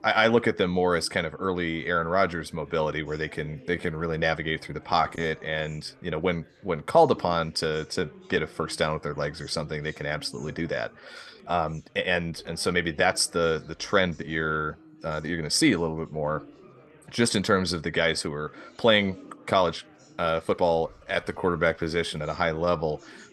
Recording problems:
chatter from many people; faint; throughout; 25 dB below the speech
uneven, jittery; strongly; from 3.5 to 22 s

